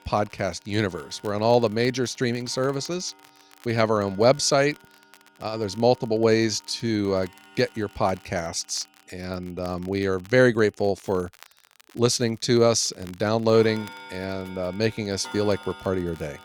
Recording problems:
household noises; faint; throughout; 20 dB below the speech
crackle, like an old record; faint; 30 dB below the speech

